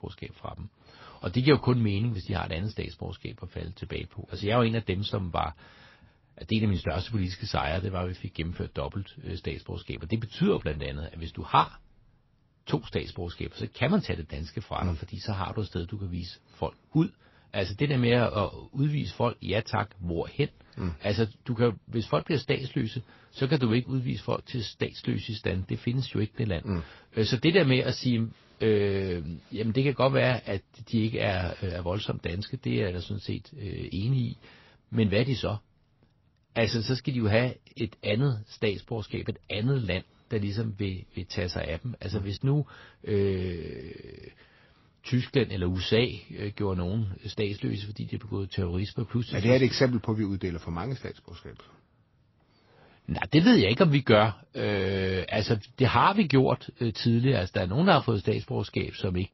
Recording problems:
garbled, watery; slightly; nothing above 5.5 kHz

